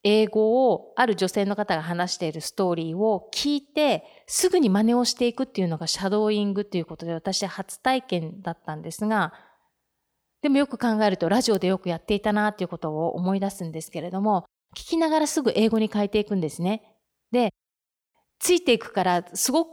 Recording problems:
none

